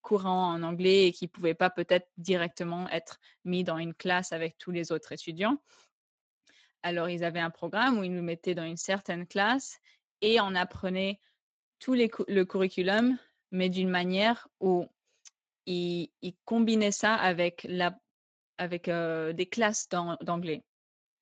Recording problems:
garbled, watery; slightly; nothing above 7.5 kHz

